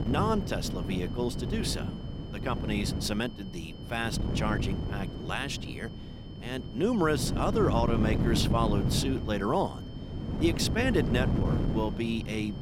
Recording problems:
wind noise on the microphone; heavy; 8 dB below the speech
high-pitched whine; faint; throughout; 3 kHz, 20 dB below the speech

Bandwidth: 16 kHz